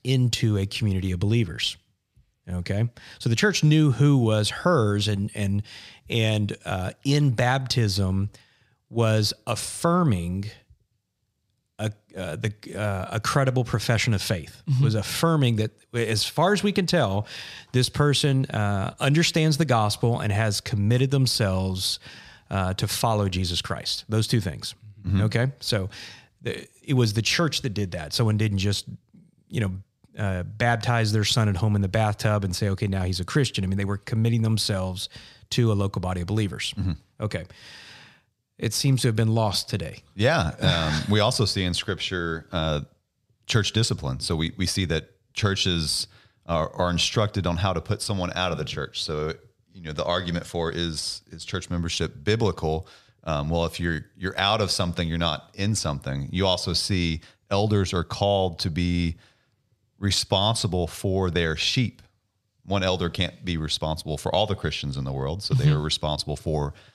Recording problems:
none

